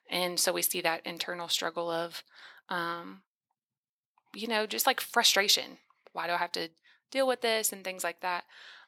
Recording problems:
thin; very; fading below 600 Hz

